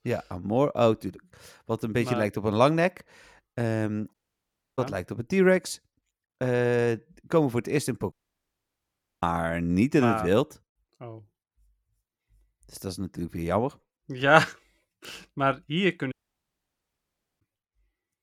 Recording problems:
audio cutting out; at 4 s for 0.5 s, at 8 s for 1 s and at 16 s for 1.5 s

